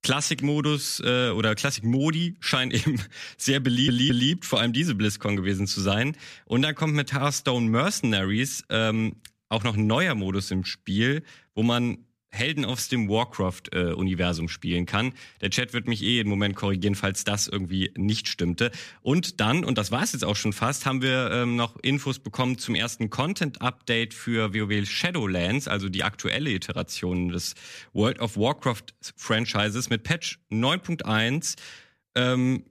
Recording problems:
audio stuttering; at 3.5 s

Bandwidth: 14.5 kHz